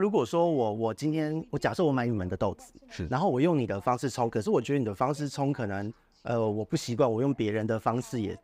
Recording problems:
voice in the background; faint; throughout; 30 dB below the speech
abrupt cut into speech; at the start

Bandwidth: 15.5 kHz